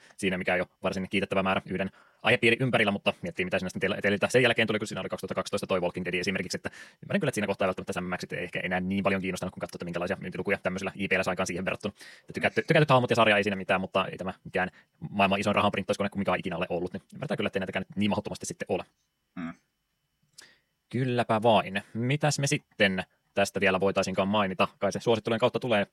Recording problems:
wrong speed, natural pitch; too fast; 1.7 times normal speed

